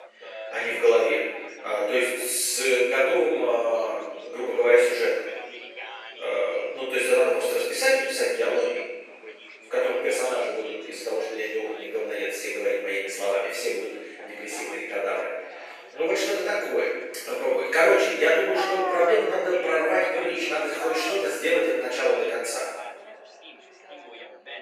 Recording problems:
room echo; strong; dies away in 1 s
off-mic speech; far
thin; very; fading below 400 Hz
animal sounds; noticeable; throughout; 10 dB below the speech
background chatter; noticeable; throughout; 3 voices, 15 dB below the speech

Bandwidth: 14.5 kHz